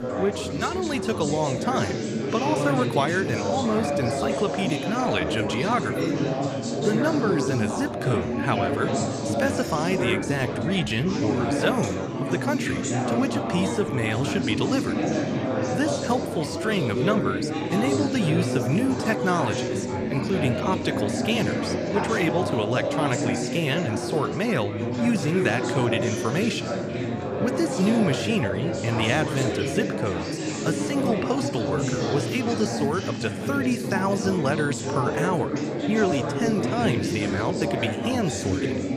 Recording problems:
chatter from many people; loud; throughout; as loud as the speech

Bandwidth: 14.5 kHz